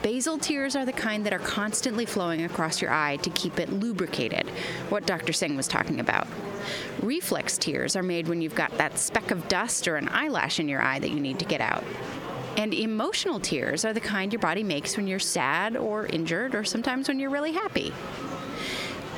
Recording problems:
squashed, flat; heavily, background pumping
murmuring crowd; noticeable; throughout; 15 dB below the speech

